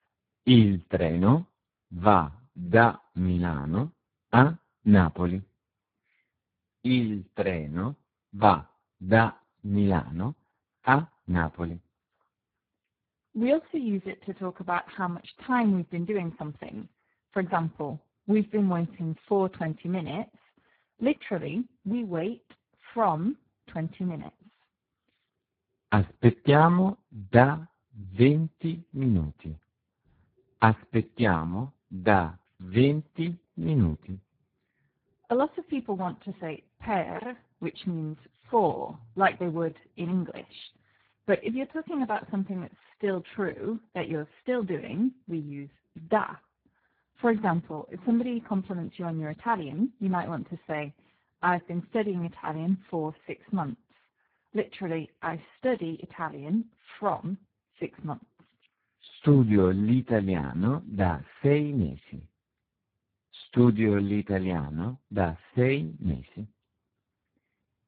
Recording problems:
garbled, watery; badly

